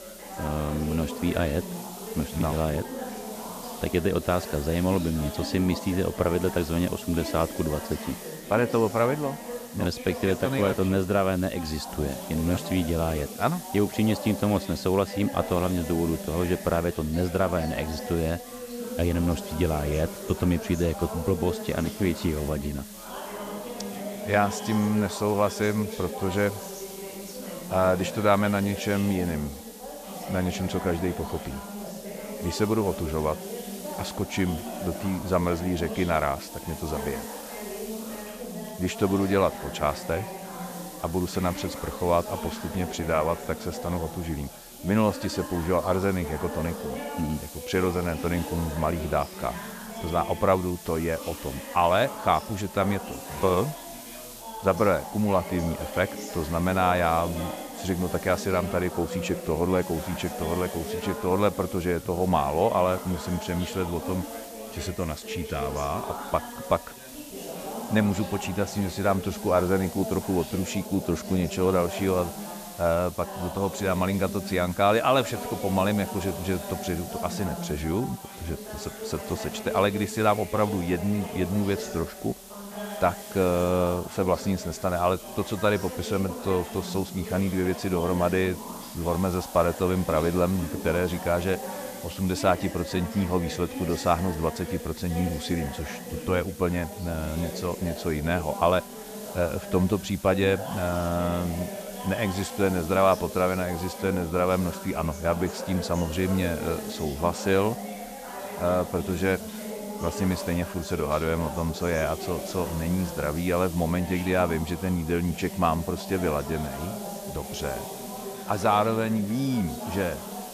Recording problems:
background chatter; noticeable; throughout; 3 voices, 10 dB below the speech
hiss; noticeable; throughout; 15 dB below the speech

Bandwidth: 14.5 kHz